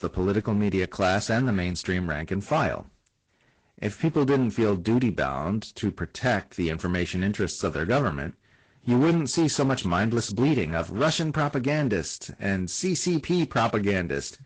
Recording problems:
distortion; slight; 7% of the sound clipped
garbled, watery; slightly; nothing above 8 kHz

